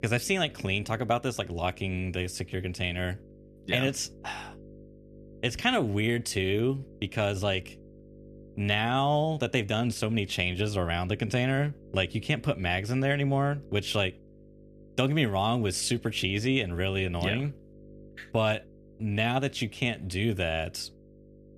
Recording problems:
electrical hum; faint; throughout; 50 Hz, 25 dB below the speech

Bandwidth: 14 kHz